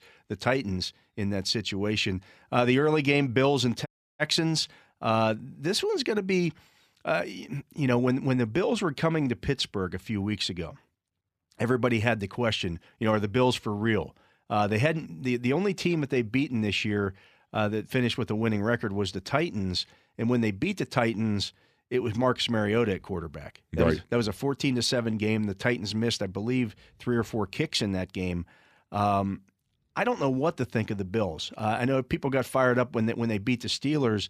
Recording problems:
audio cutting out; at 4 s

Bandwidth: 14.5 kHz